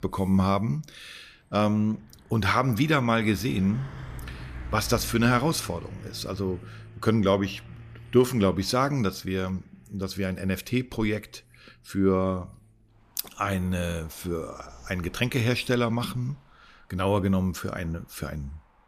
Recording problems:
traffic noise; noticeable; throughout; 20 dB below the speech

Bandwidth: 14.5 kHz